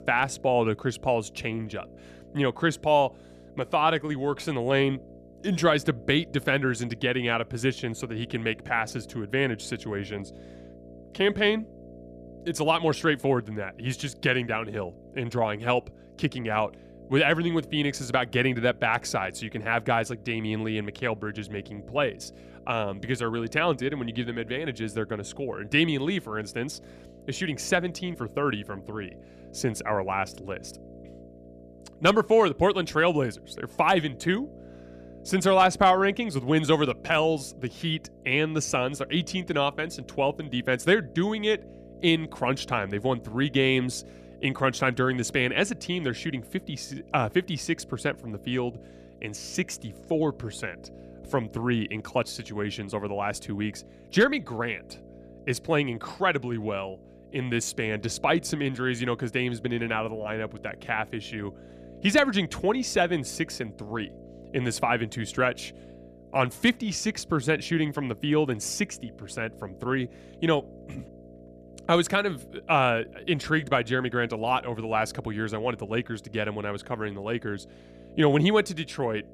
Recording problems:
electrical hum; faint; throughout; 60 Hz, 25 dB below the speech

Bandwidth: 14.5 kHz